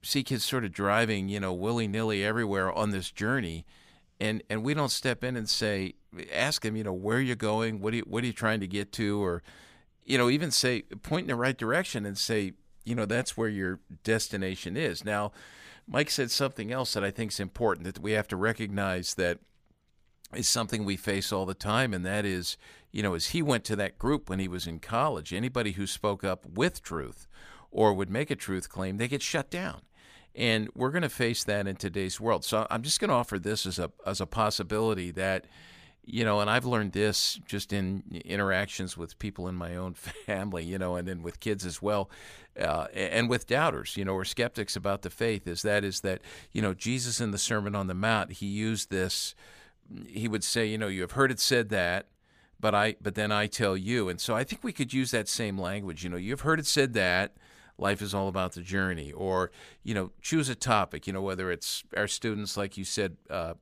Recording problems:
none

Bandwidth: 15 kHz